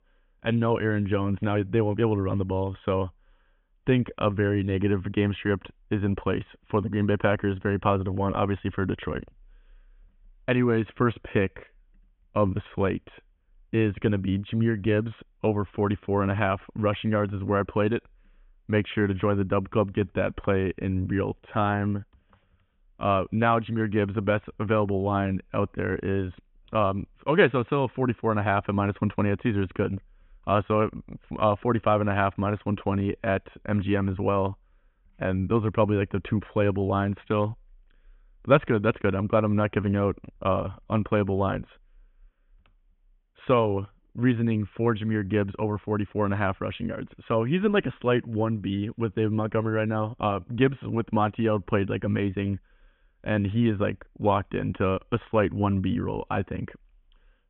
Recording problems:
high frequencies cut off; severe; nothing above 3.5 kHz

